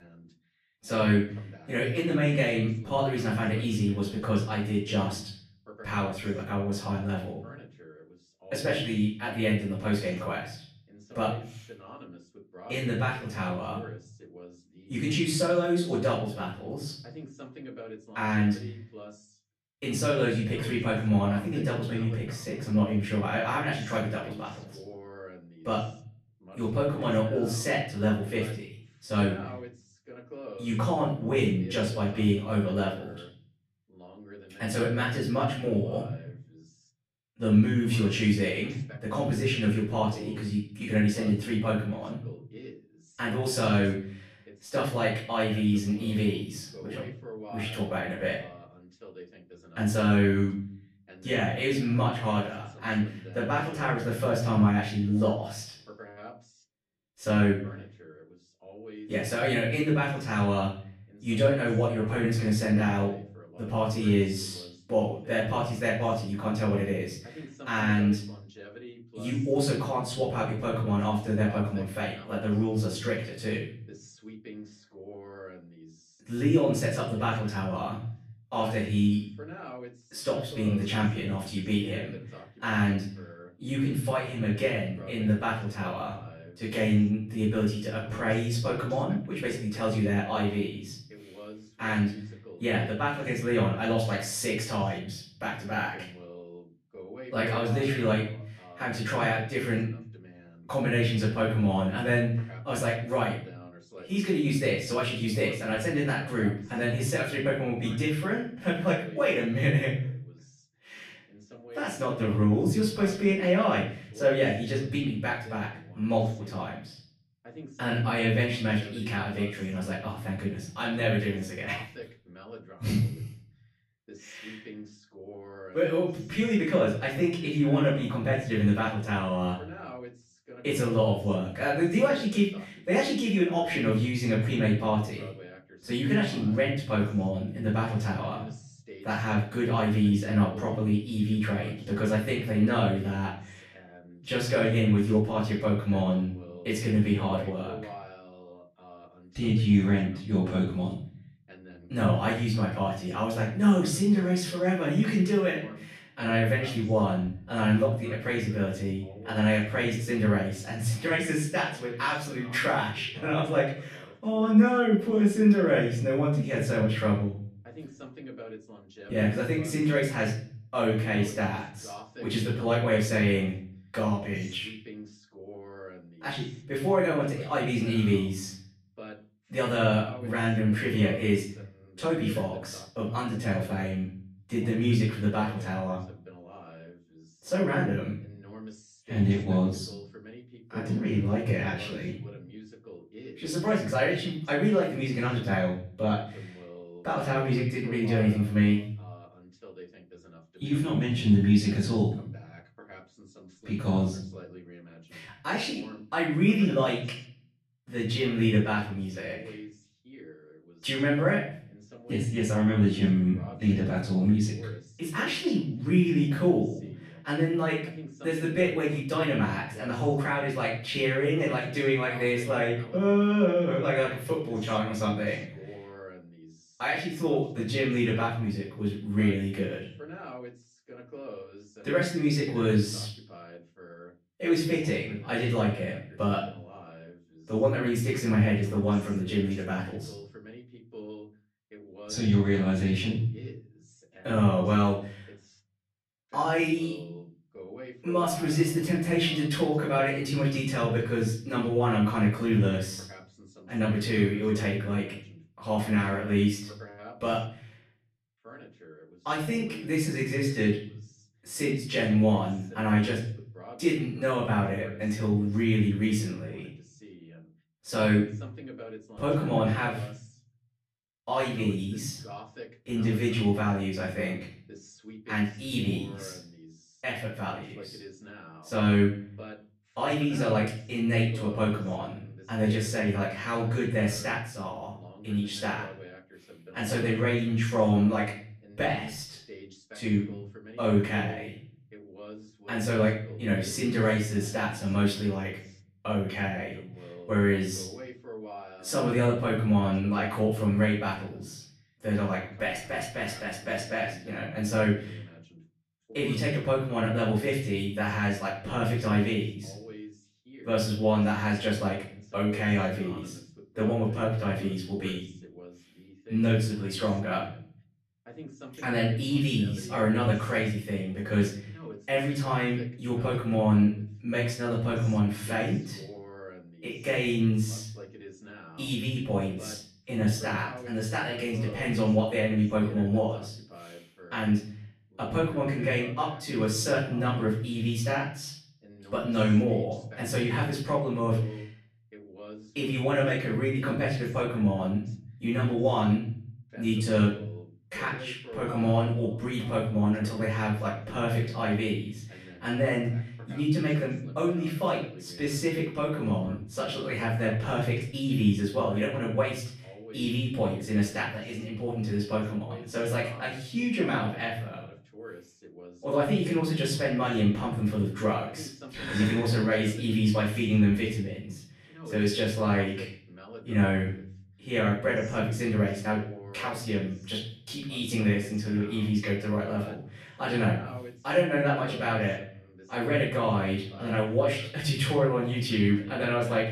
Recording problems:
off-mic speech; far
room echo; noticeable; dies away in 0.5 s
voice in the background; noticeable; throughout; 20 dB below the speech

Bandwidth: 14.5 kHz